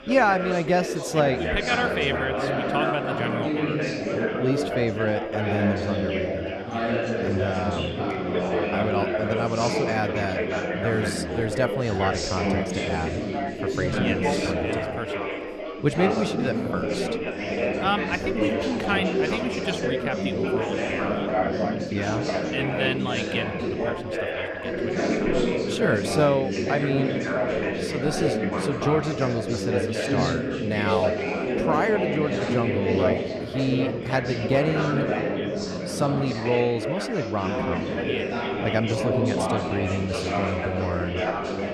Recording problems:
chatter from many people; very loud; throughout; 1 dB above the speech

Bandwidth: 14 kHz